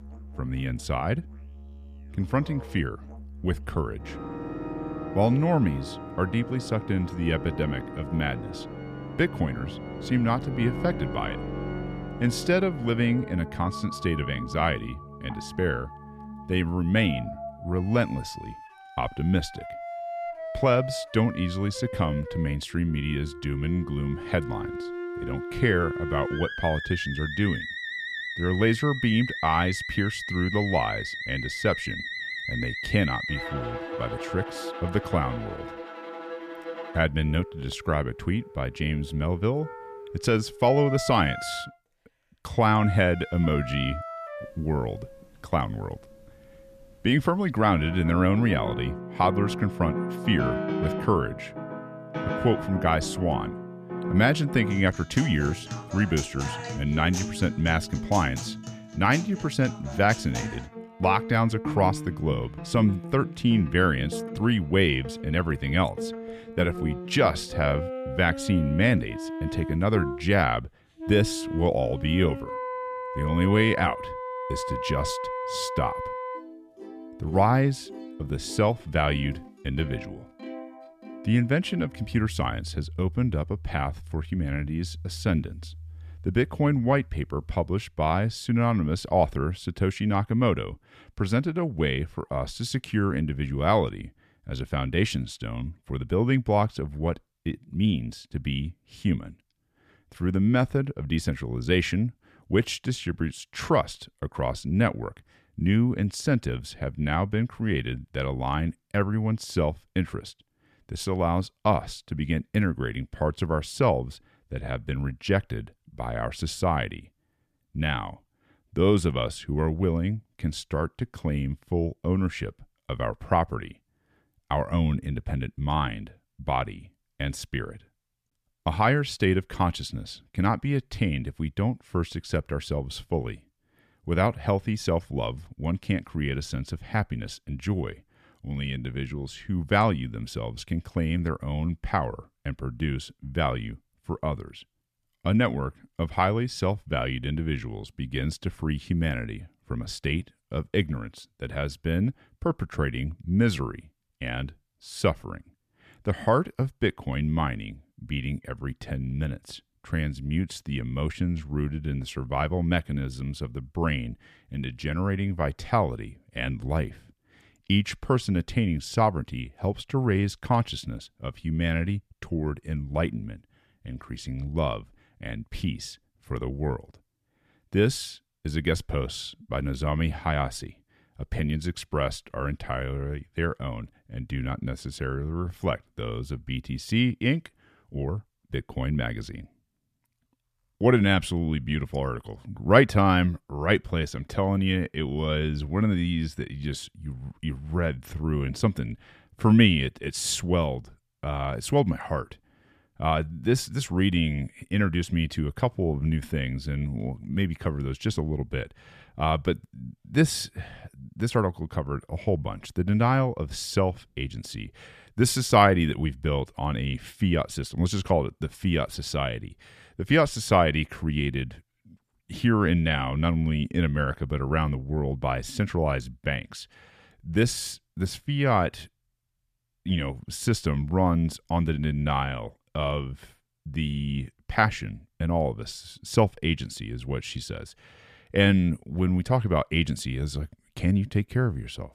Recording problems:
background music; loud; until 1:28; 9 dB below the speech

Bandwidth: 14.5 kHz